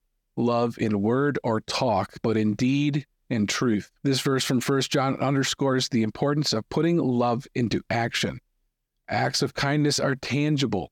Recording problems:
none

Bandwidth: 18 kHz